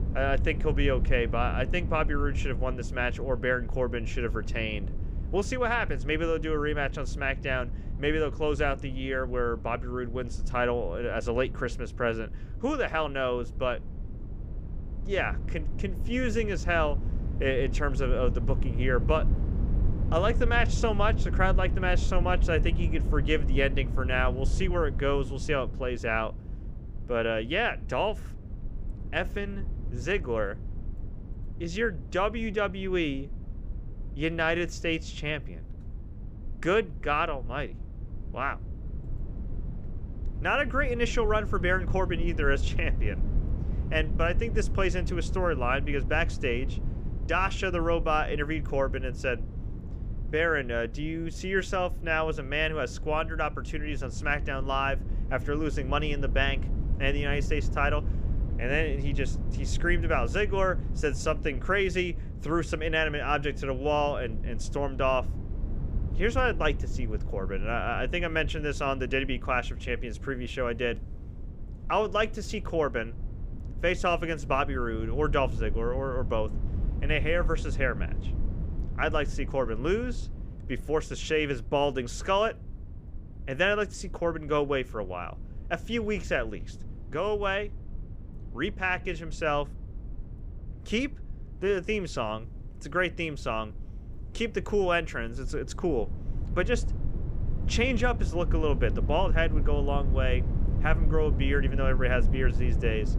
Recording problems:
low rumble; noticeable; throughout; 20 dB below the speech

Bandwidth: 15 kHz